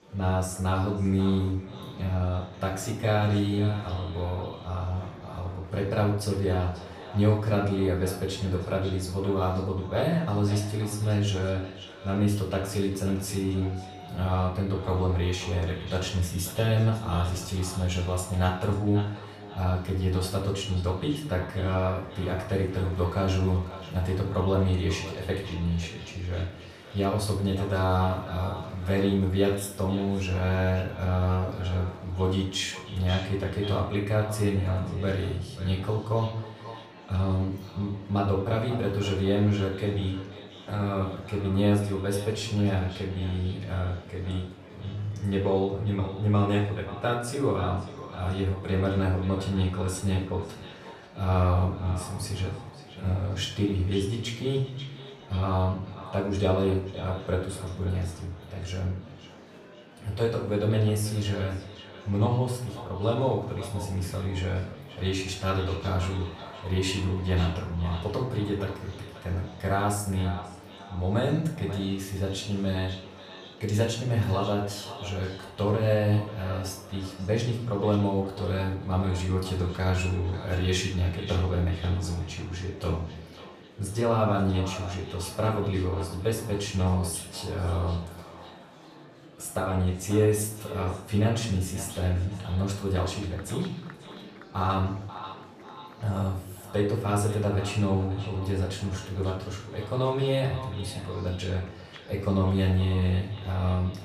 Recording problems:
off-mic speech; far
echo of what is said; noticeable; throughout; 540 ms later, 15 dB below the speech
room echo; noticeable; dies away in 0.5 s
murmuring crowd; faint; throughout; 20 dB below the speech

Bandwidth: 15 kHz